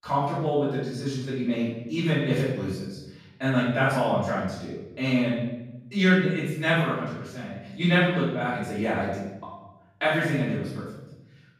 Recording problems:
off-mic speech; far
room echo; noticeable; dies away in 1 s

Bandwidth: 15 kHz